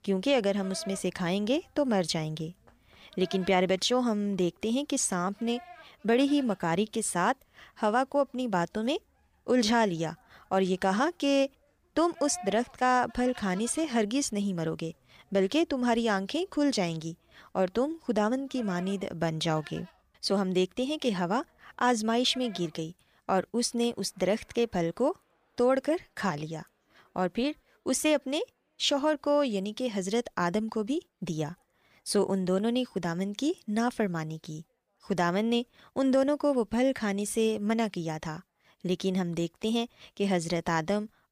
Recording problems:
animal sounds; faint; throughout; 20 dB below the speech

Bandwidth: 15 kHz